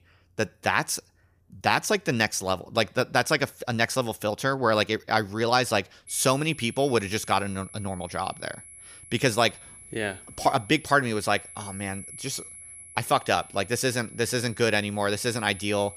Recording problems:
high-pitched whine; noticeable; from 6 s on; 11 kHz, 15 dB below the speech

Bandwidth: 15 kHz